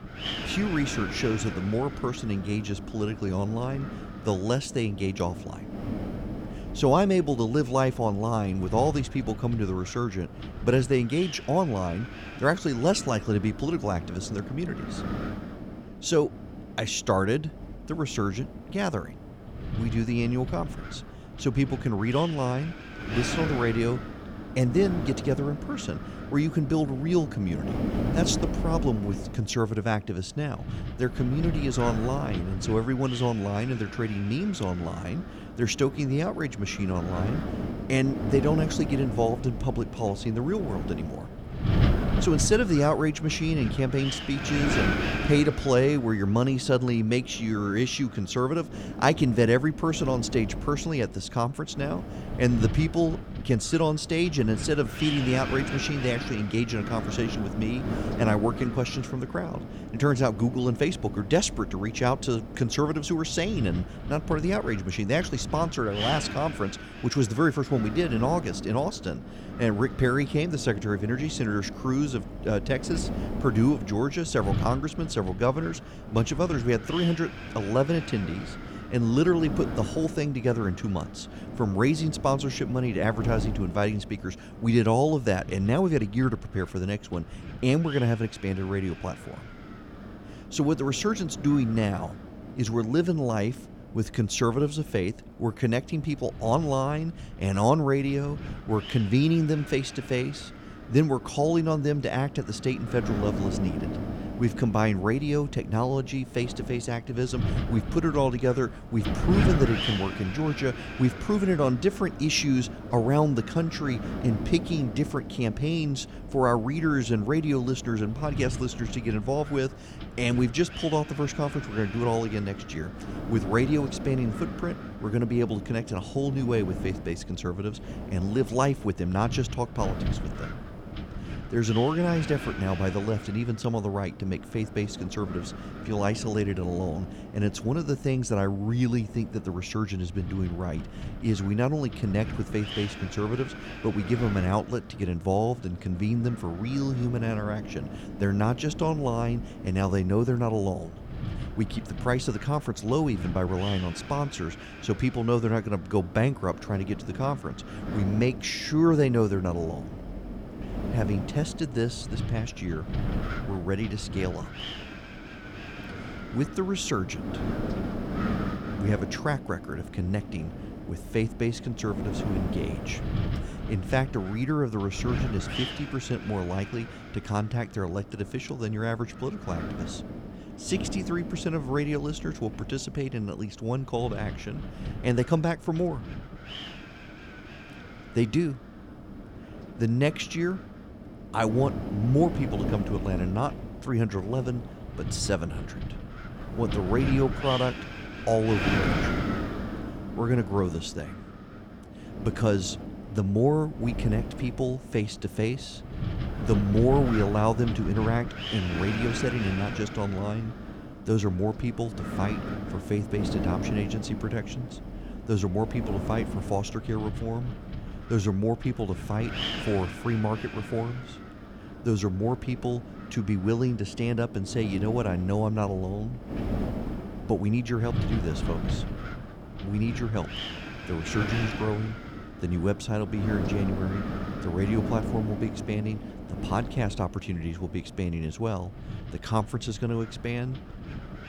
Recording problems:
wind noise on the microphone; heavy; 9 dB below the speech

